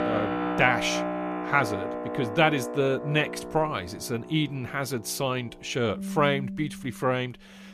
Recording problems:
background music; loud; throughout; 6 dB below the speech

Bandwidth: 14.5 kHz